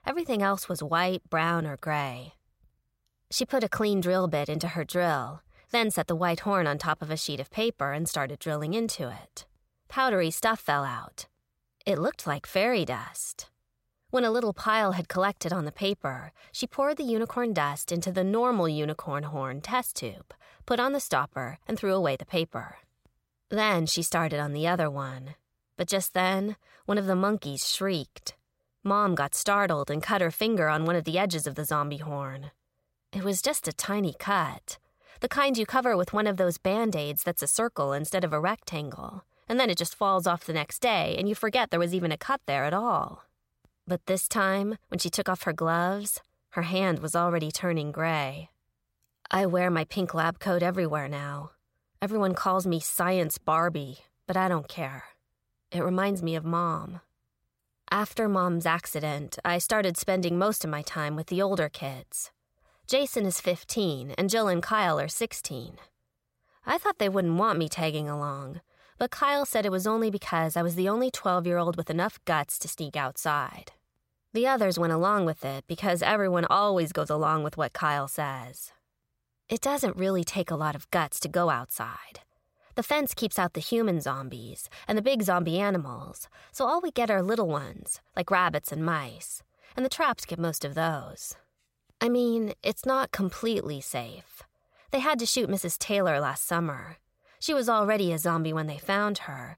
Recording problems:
none

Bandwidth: 16 kHz